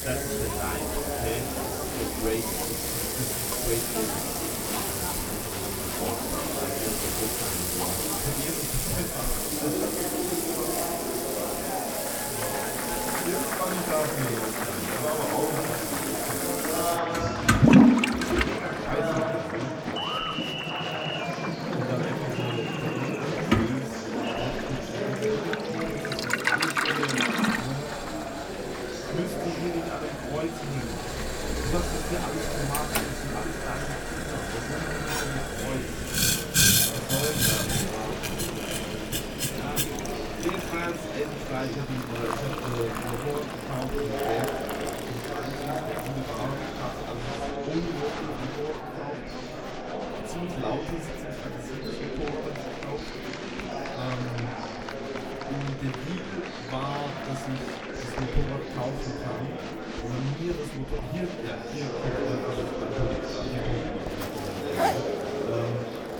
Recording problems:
off-mic speech; far
room echo; very slight; dies away in 0.2 s
household noises; very loud; throughout; 6 dB above the speech
murmuring crowd; very loud; throughout; 2 dB above the speech

